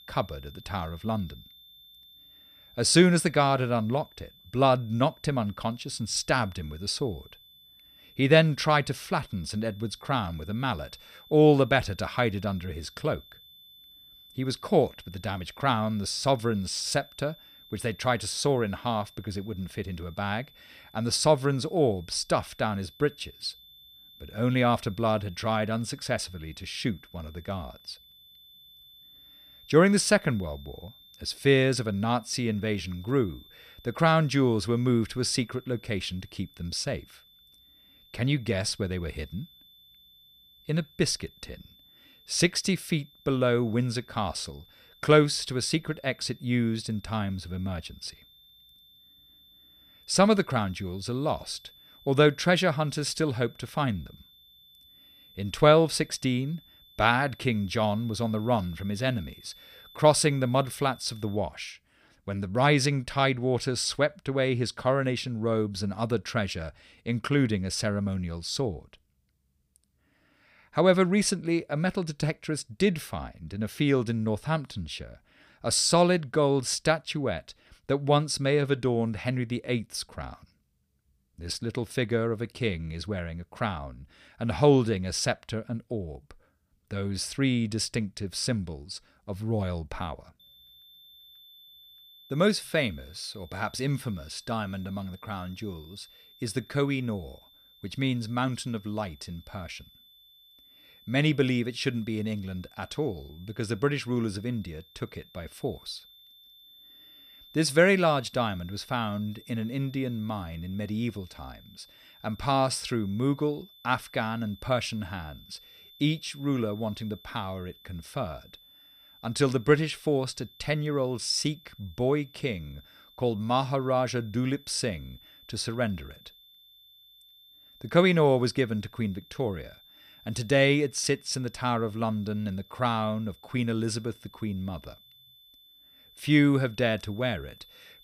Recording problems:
high-pitched whine; faint; until 1:01 and from 1:30 on; 3.5 kHz, 25 dB below the speech

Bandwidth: 15 kHz